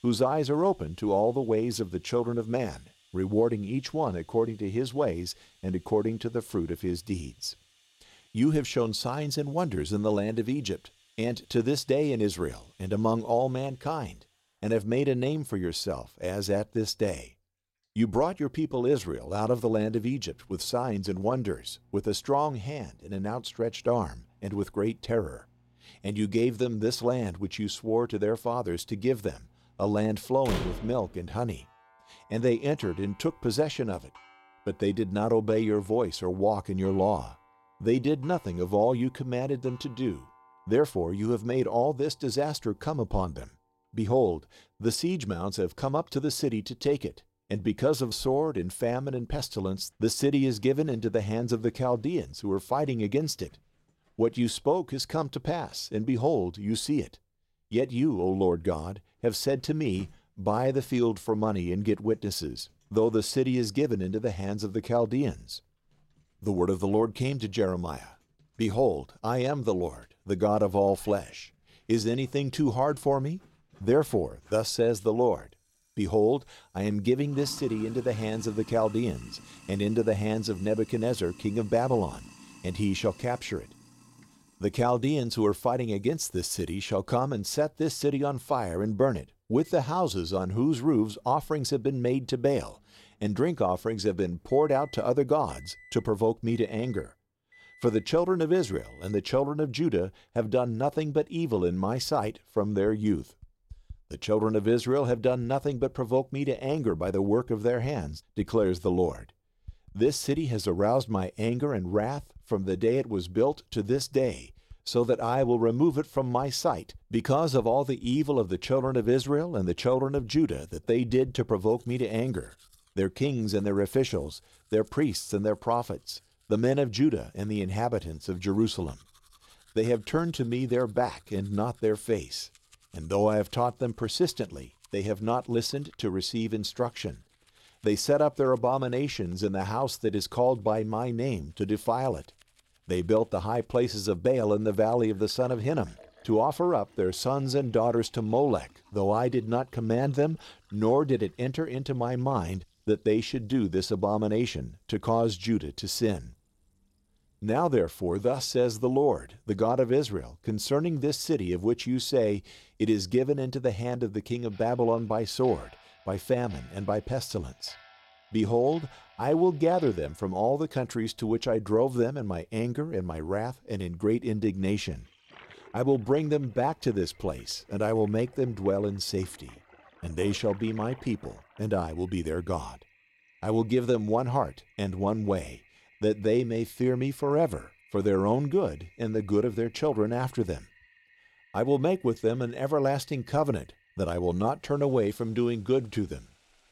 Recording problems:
household noises; faint; throughout; 30 dB below the speech
door banging; noticeable; at 30 s; peak 5 dB below the speech

